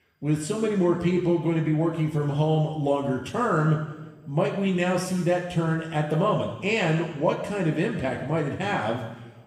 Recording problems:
room echo; noticeable; dies away in 1.1 s
off-mic speech; somewhat distant

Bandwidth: 14.5 kHz